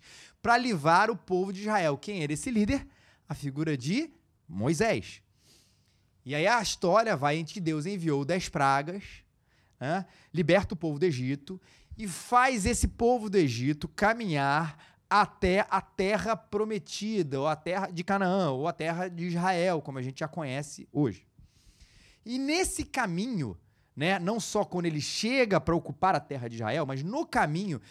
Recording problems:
uneven, jittery; strongly; from 3.5 to 27 s

